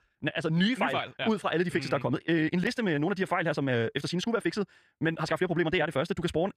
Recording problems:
wrong speed, natural pitch; too fast; 1.5 times normal speed

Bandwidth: 14.5 kHz